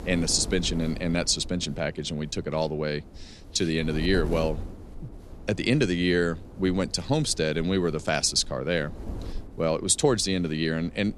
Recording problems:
wind noise on the microphone; occasional gusts; 20 dB below the speech

